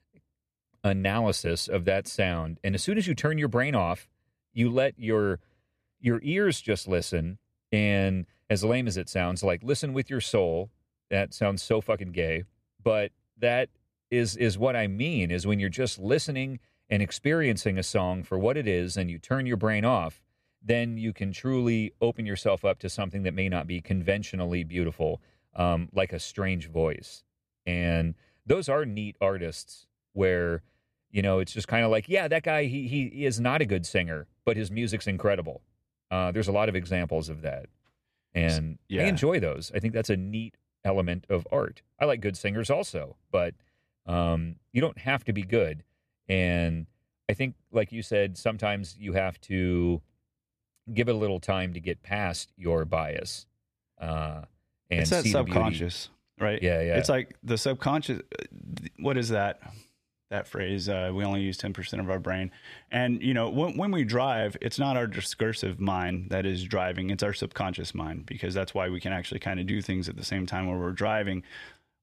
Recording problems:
none

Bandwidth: 14.5 kHz